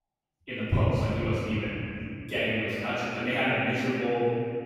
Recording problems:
room echo; strong; dies away in 2.9 s
off-mic speech; far

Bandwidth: 16.5 kHz